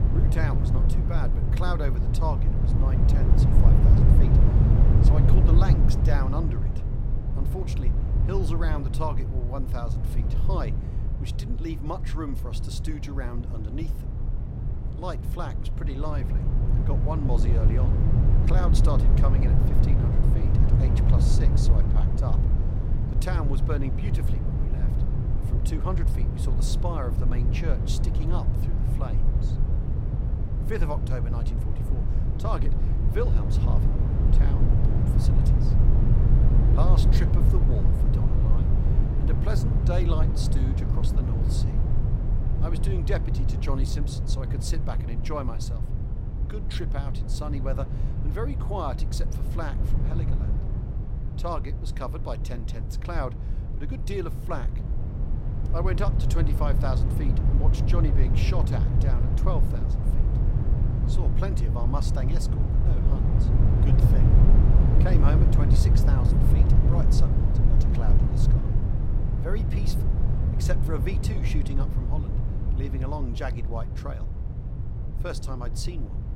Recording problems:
low rumble; loud; throughout; 1 dB below the speech

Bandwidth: 16 kHz